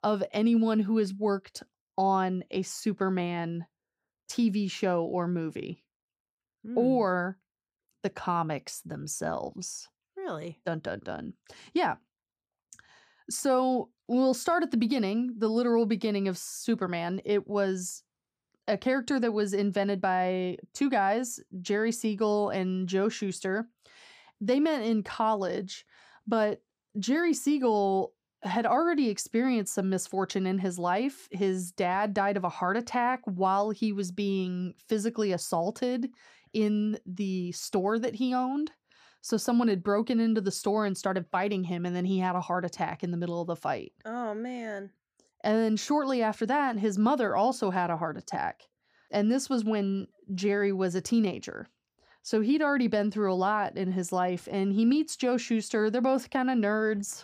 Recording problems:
none

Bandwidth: 15 kHz